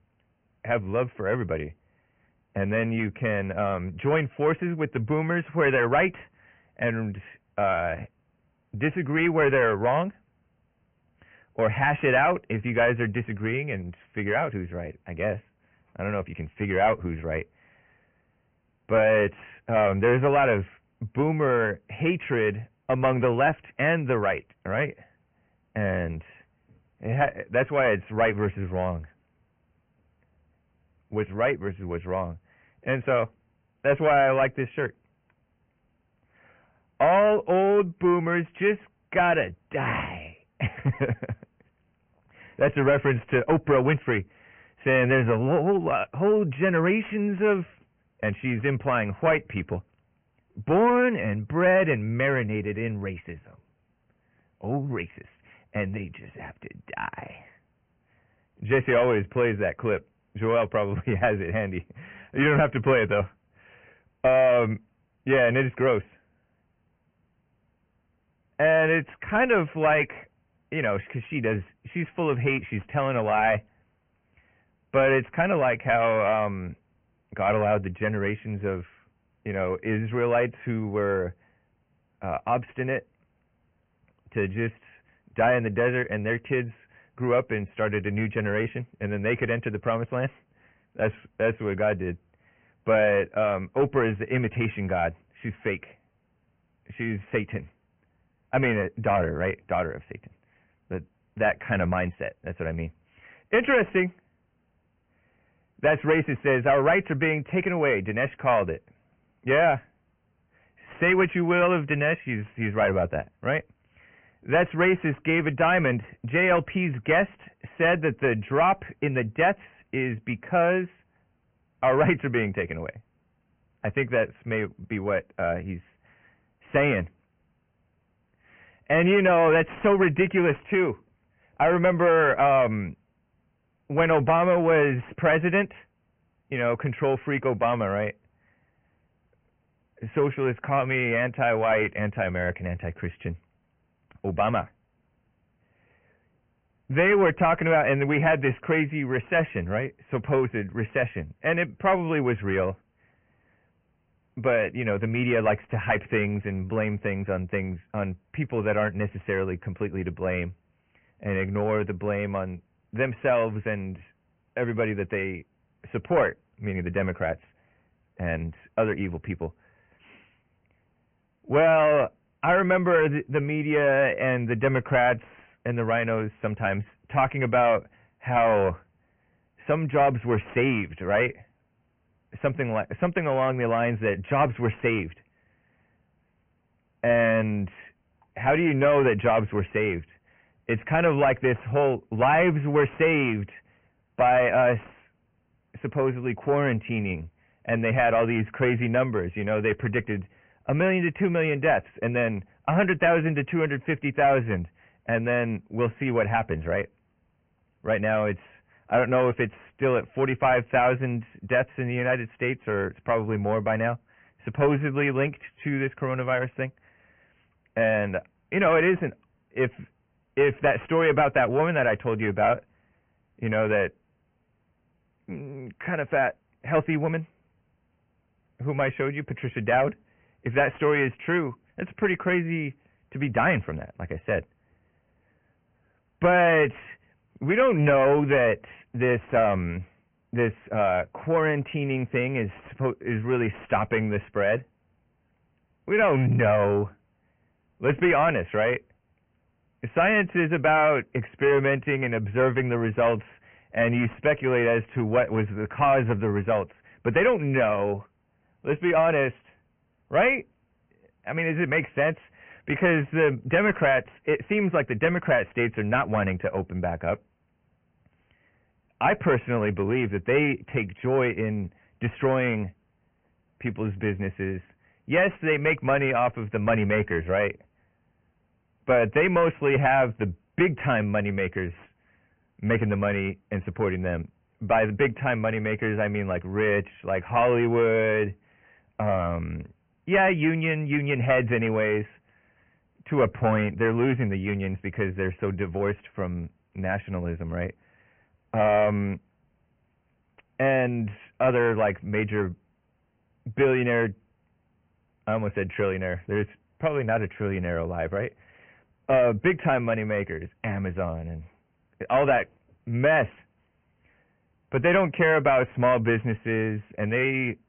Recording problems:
high frequencies cut off; severe; nothing above 2.5 kHz
distortion; slight; 10 dB below the speech
garbled, watery; slightly

